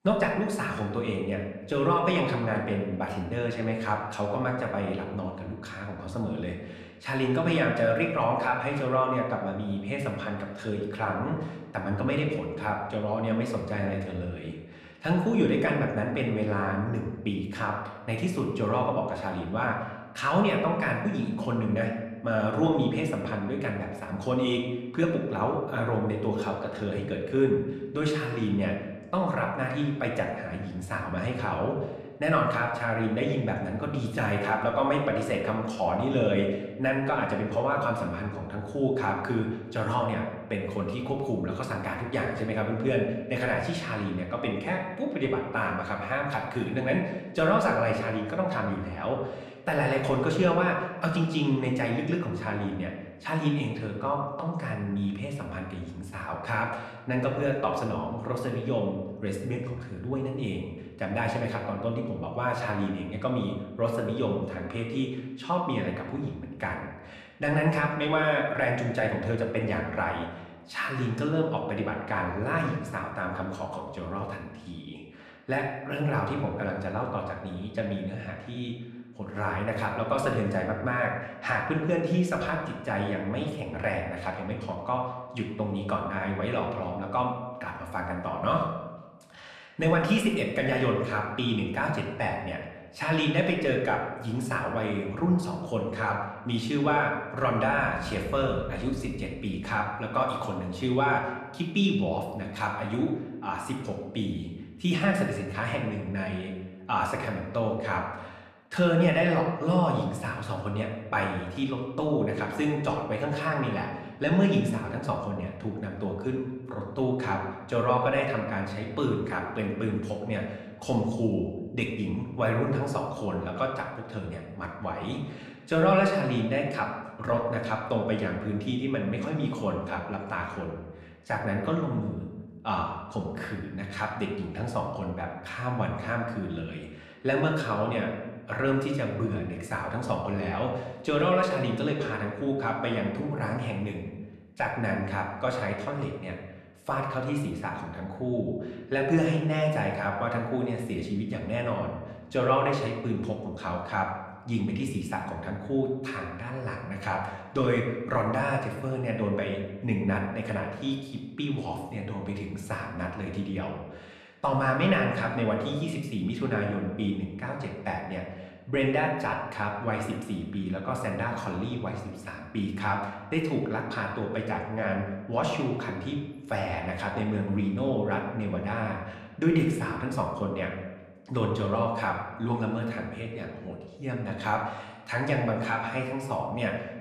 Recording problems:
room echo; slight; dies away in 0.9 s
off-mic speech; somewhat distant

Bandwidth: 14.5 kHz